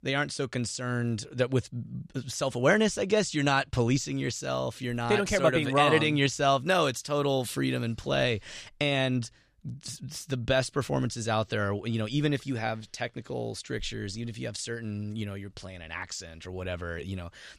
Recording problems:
none

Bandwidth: 14 kHz